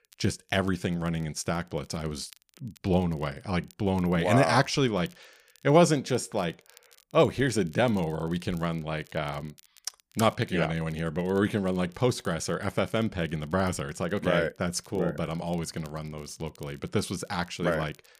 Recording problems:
crackle, like an old record; faint; 30 dB below the speech

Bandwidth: 15 kHz